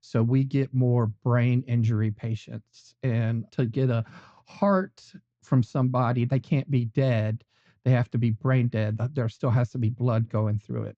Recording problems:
muffled; very; fading above 2 kHz
high frequencies cut off; noticeable; nothing above 8 kHz

